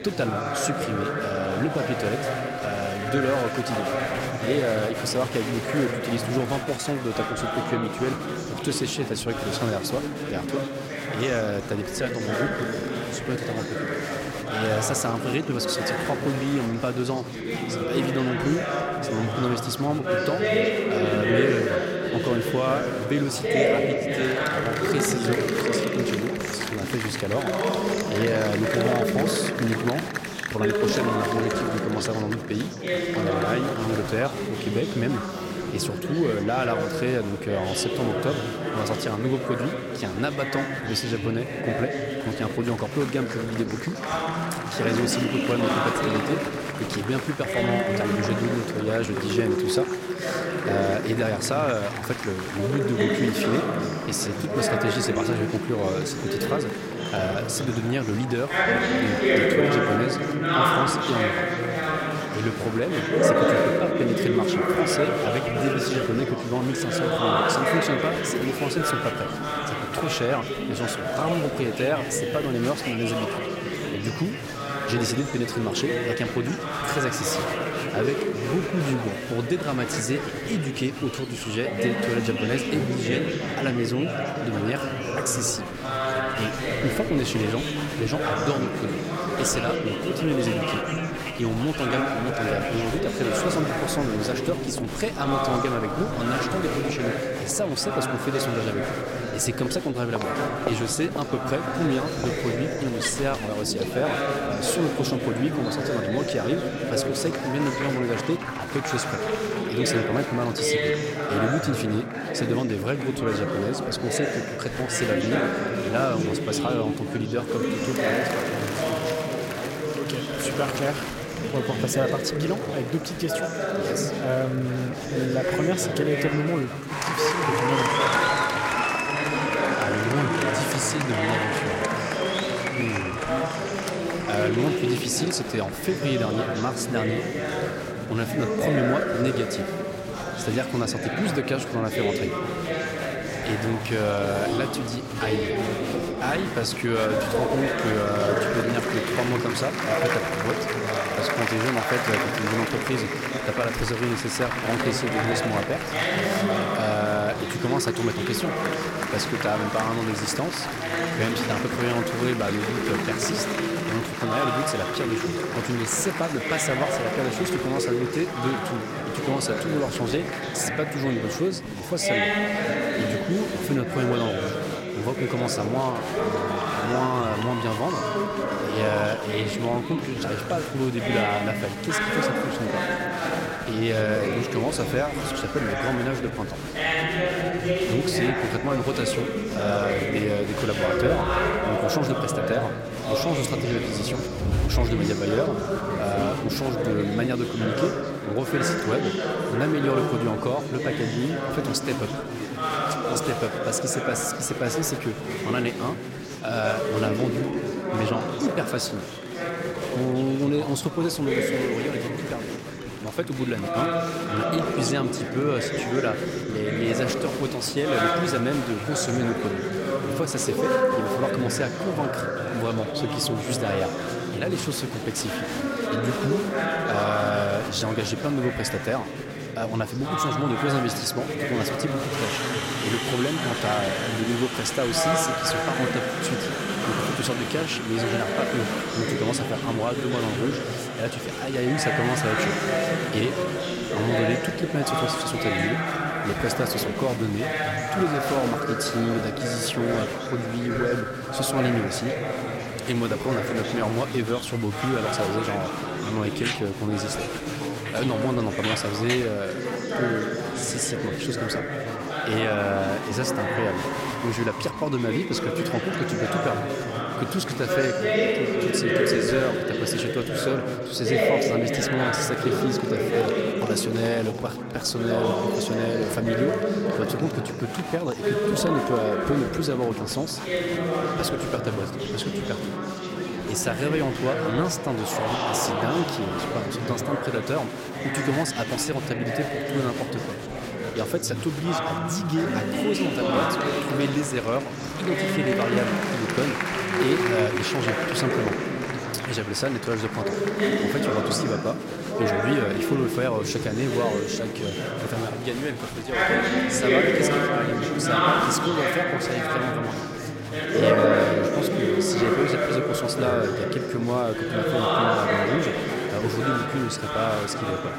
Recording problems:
chatter from many people; very loud; throughout; 1 dB above the speech

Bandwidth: 16 kHz